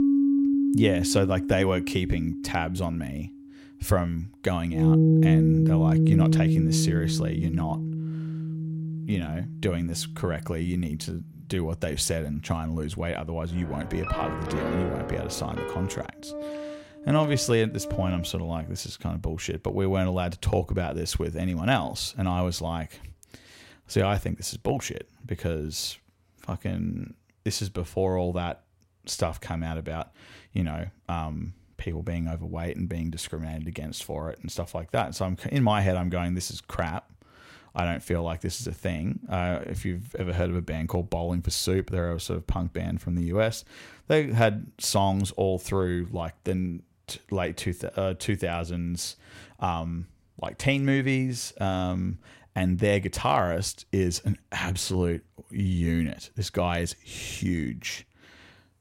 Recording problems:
background music; very loud; until 18 s; 3 dB above the speech

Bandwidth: 16 kHz